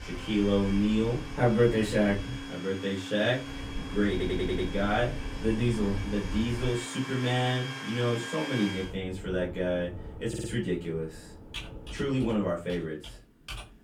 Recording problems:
off-mic speech; far
room echo; very slight; dies away in 0.2 s
household noises; noticeable; throughout; 10 dB below the speech
low rumble; noticeable; until 2.5 s, from 3.5 to 6.5 s and from 9 to 13 s; 20 dB below the speech
audio stuttering; at 4 s and at 10 s

